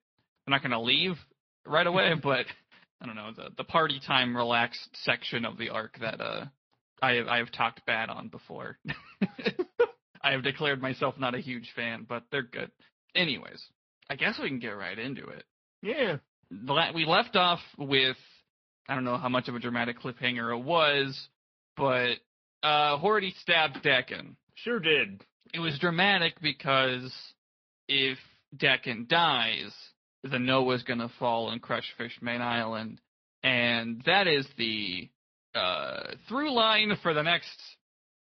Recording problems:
high frequencies cut off; noticeable; nothing above 5.5 kHz
garbled, watery; slightly

